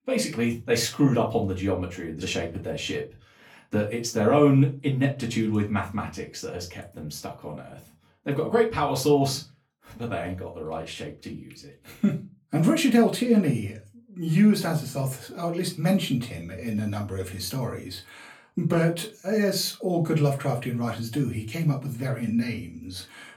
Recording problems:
off-mic speech; far
room echo; very slight; dies away in 0.2 s

